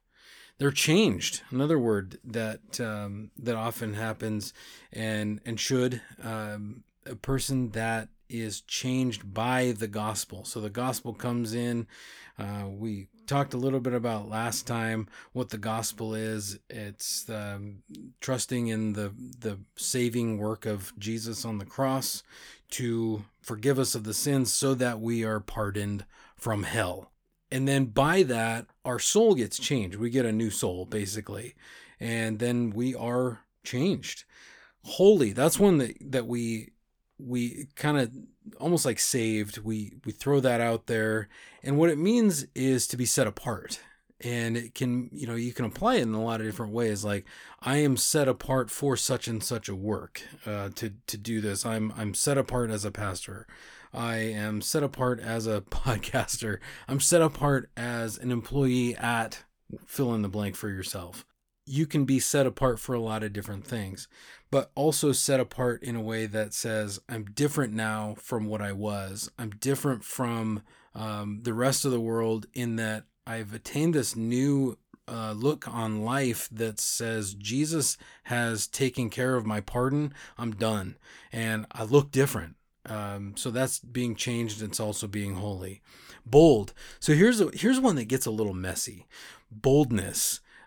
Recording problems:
none

